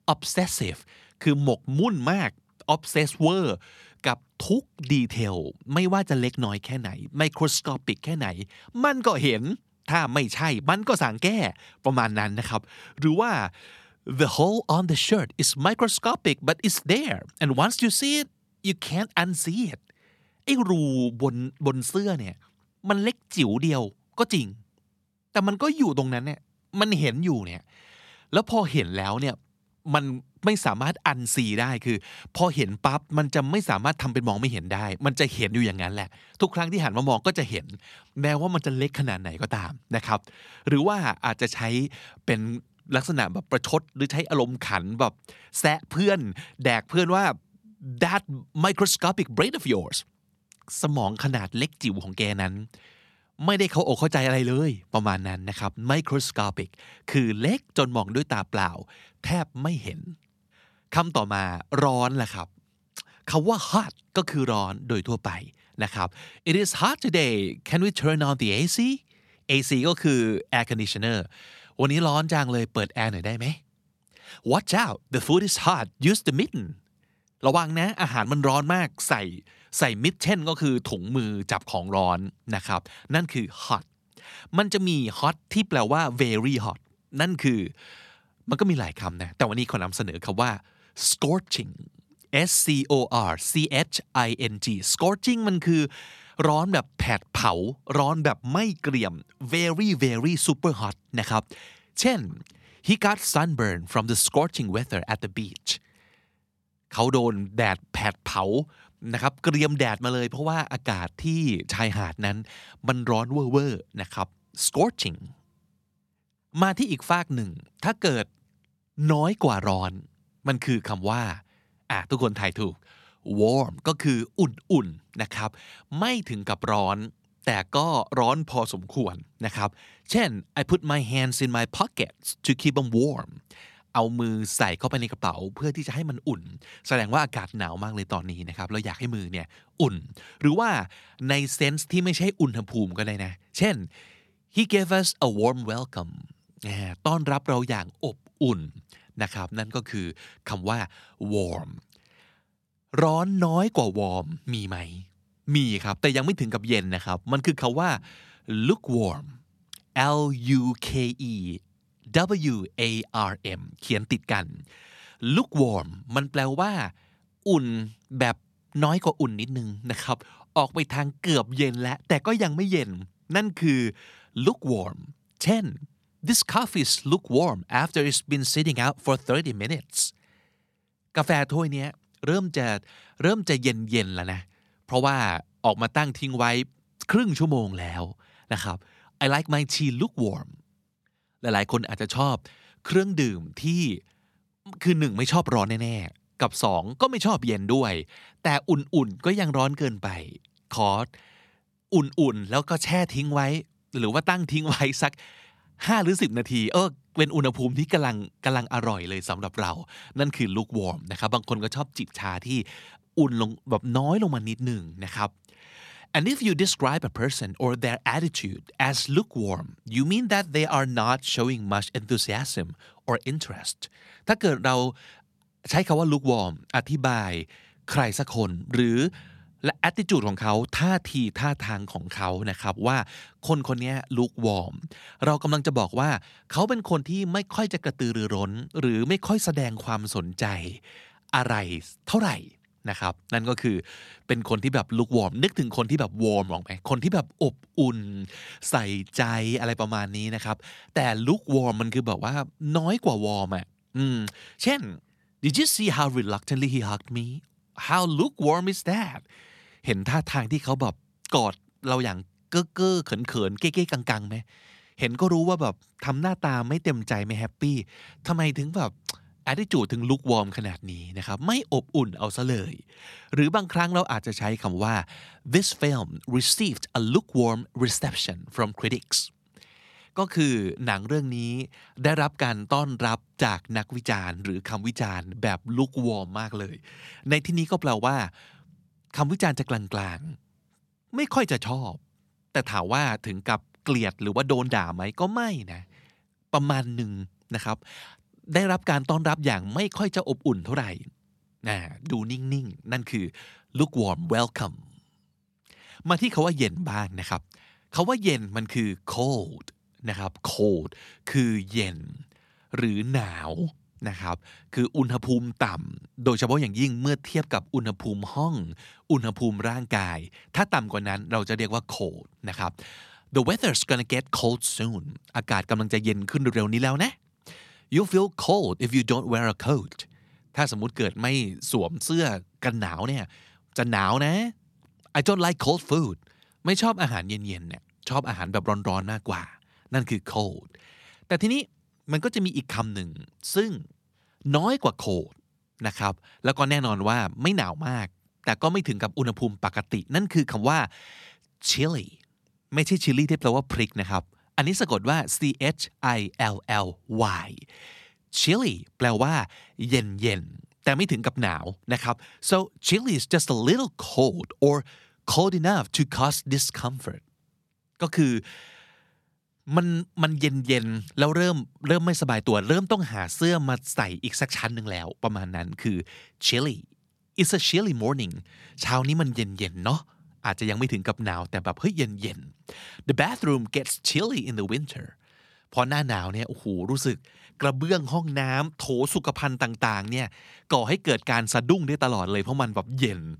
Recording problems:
none

